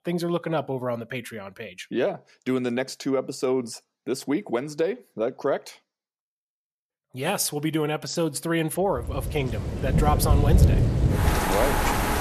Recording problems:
rain or running water; very loud; from 9.5 s on; 4 dB above the speech

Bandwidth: 13.5 kHz